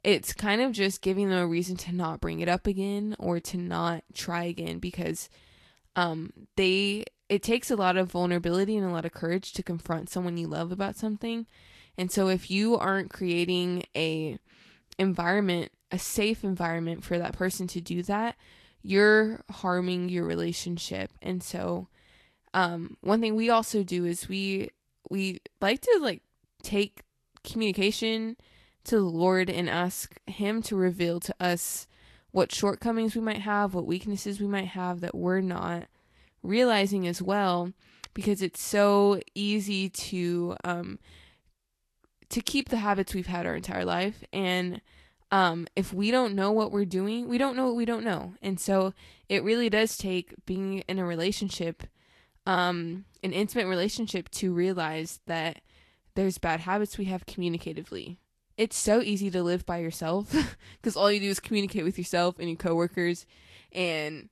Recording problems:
garbled, watery; slightly; nothing above 12.5 kHz

